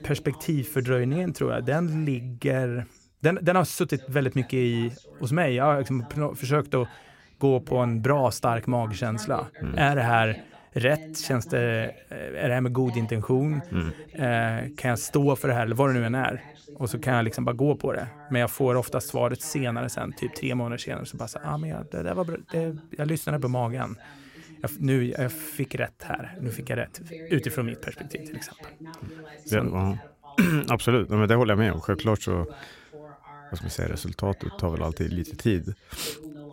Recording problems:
voice in the background; noticeable; throughout; 20 dB below the speech

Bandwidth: 16 kHz